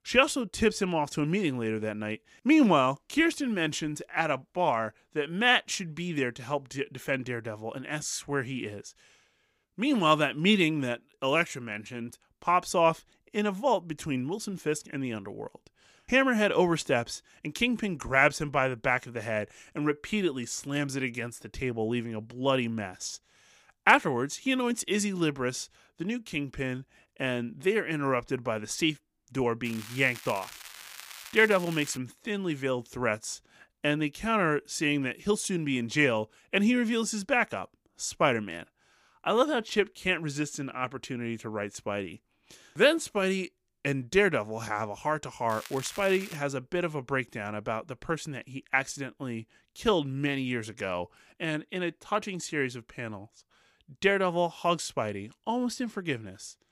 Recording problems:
crackling; noticeable; from 30 to 32 s and at 46 s; 15 dB below the speech

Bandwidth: 15 kHz